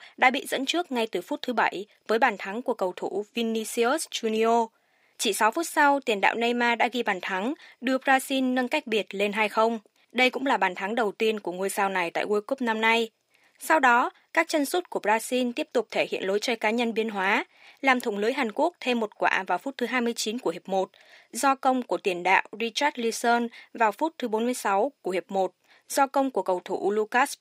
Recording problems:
thin; somewhat; fading below 450 Hz

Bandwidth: 15.5 kHz